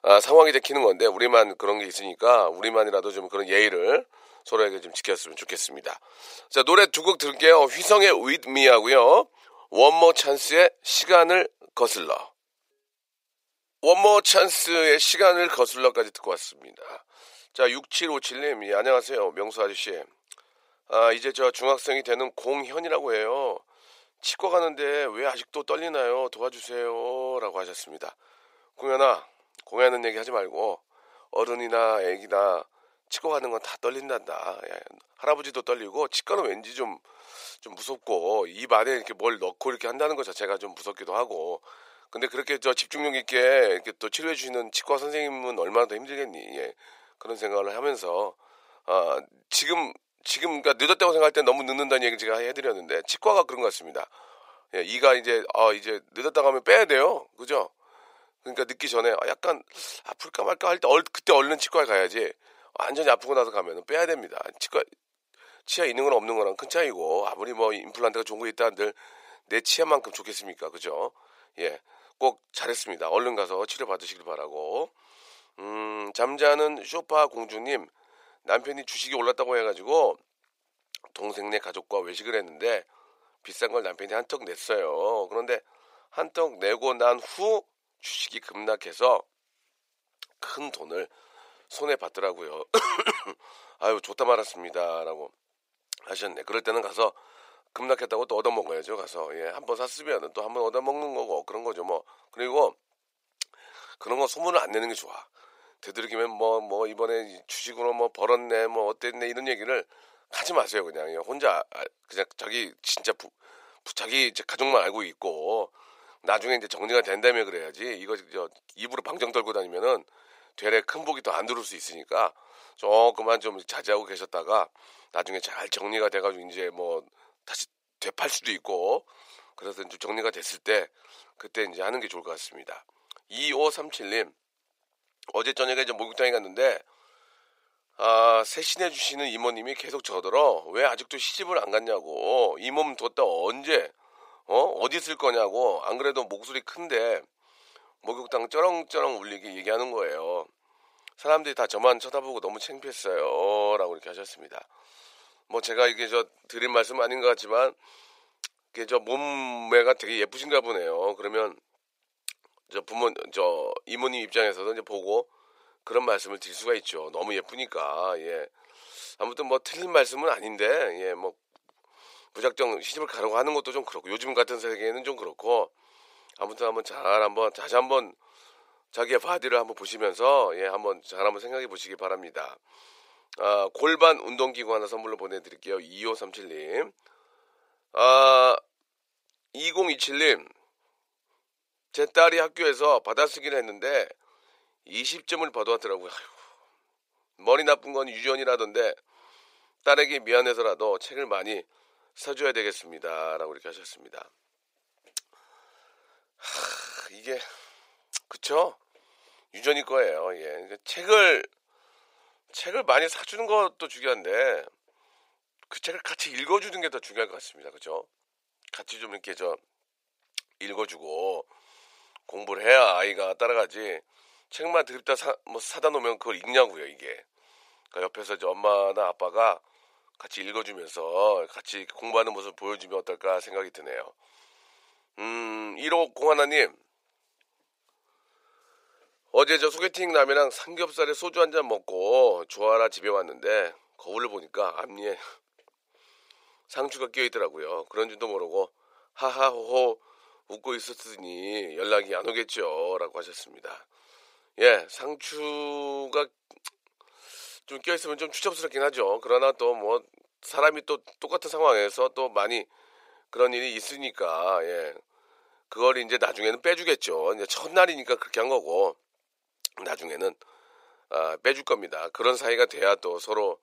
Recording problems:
thin; very; fading below 500 Hz

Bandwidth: 15.5 kHz